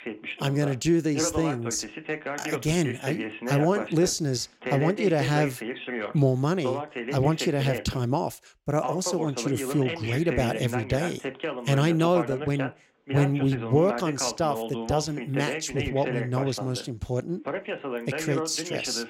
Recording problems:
voice in the background; loud; throughout; 7 dB below the speech

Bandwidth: 16 kHz